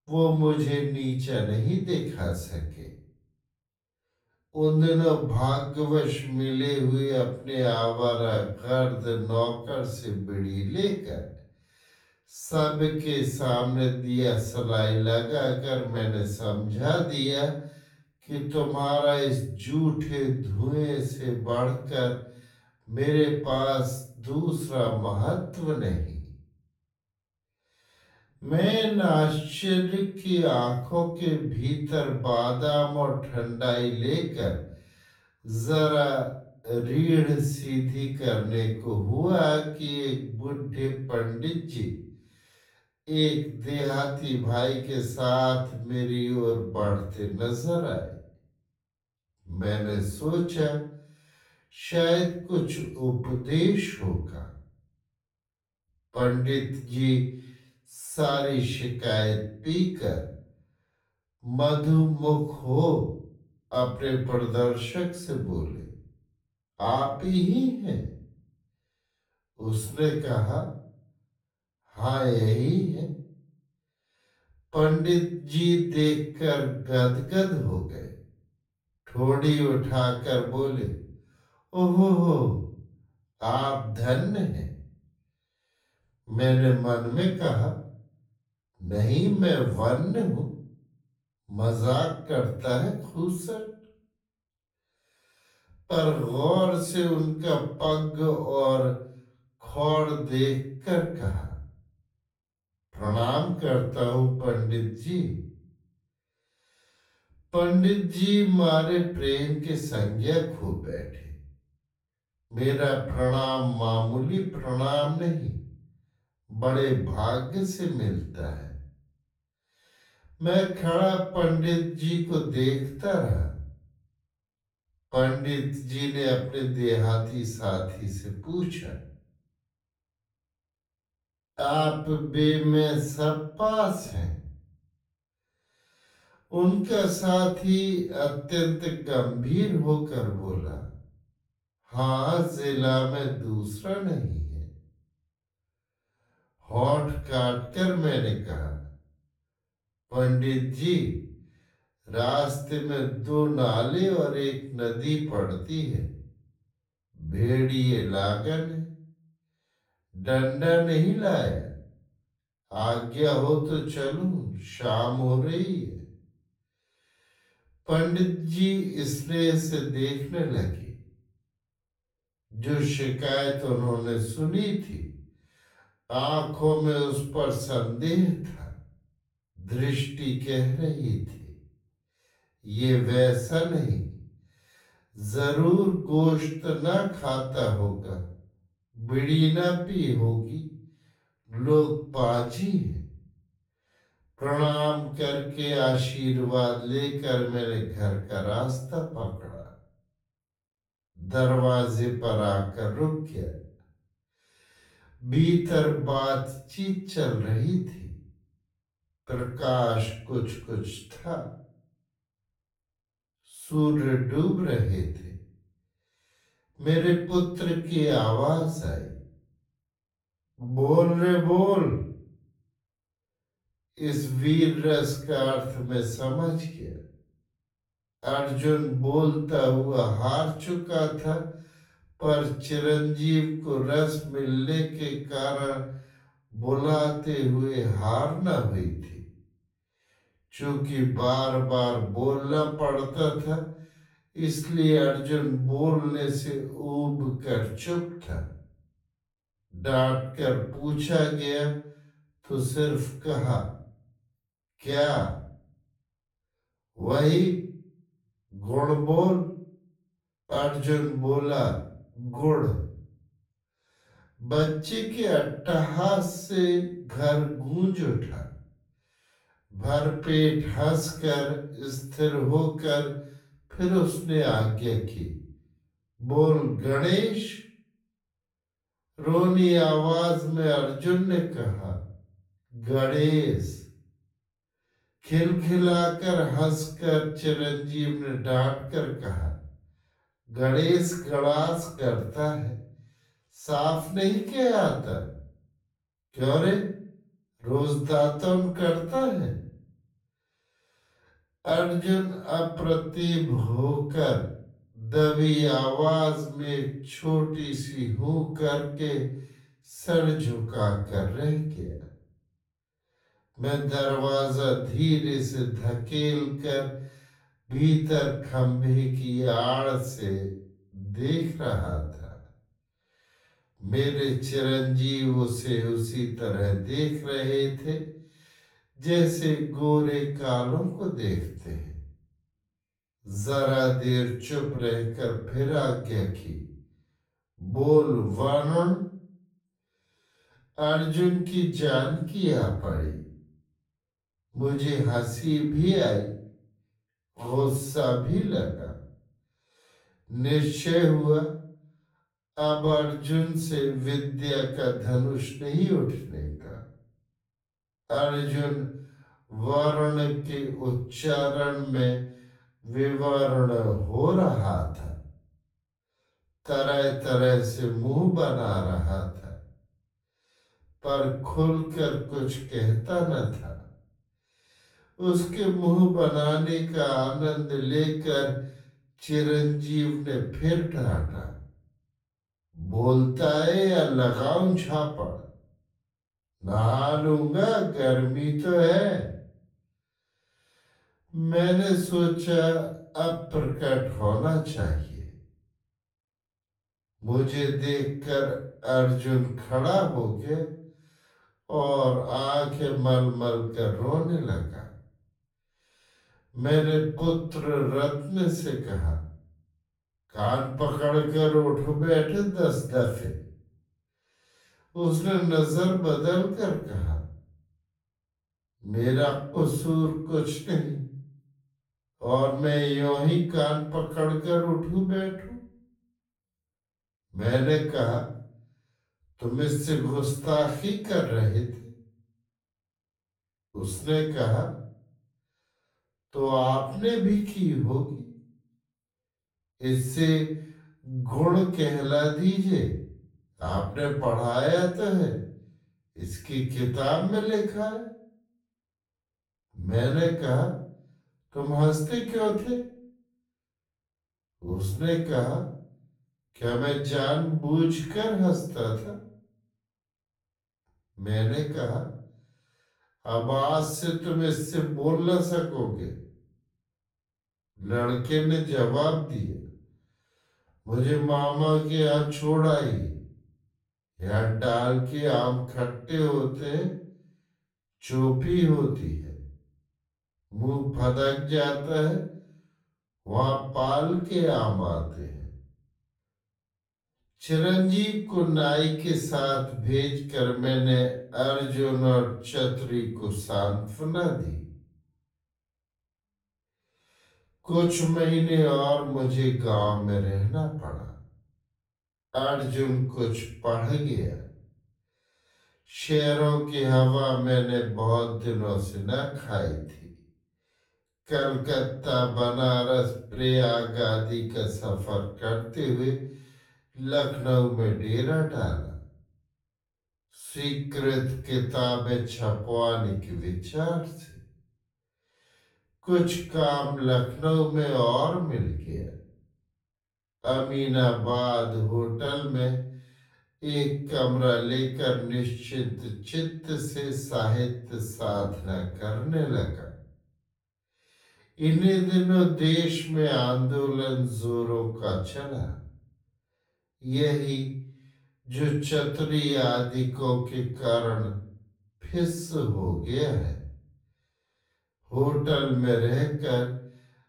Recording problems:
off-mic speech; far
wrong speed, natural pitch; too slow; 0.5 times normal speed
room echo; noticeable; dies away in 0.5 s

